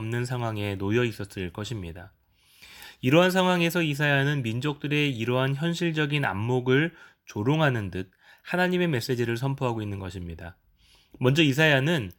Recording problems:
abrupt cut into speech; at the start

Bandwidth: 18 kHz